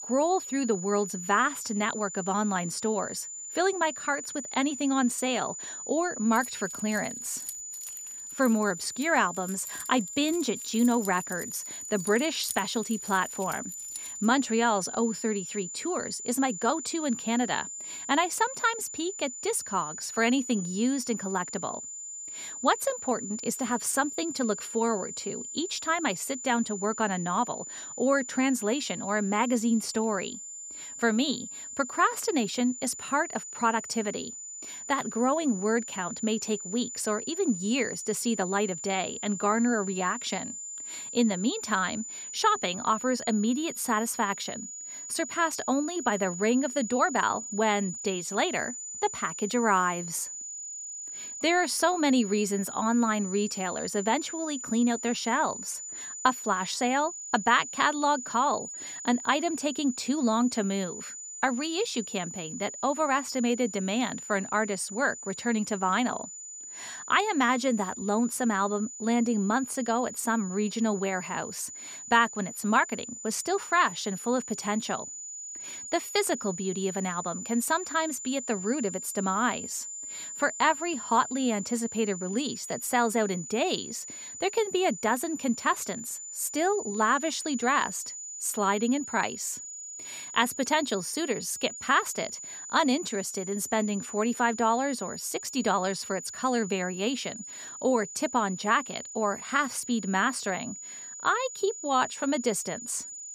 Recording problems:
high-pitched whine; loud; throughout; 7 kHz, 9 dB below the speech
jangling keys; noticeable; from 6.5 to 14 s; peak 8 dB below the speech

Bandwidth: 15 kHz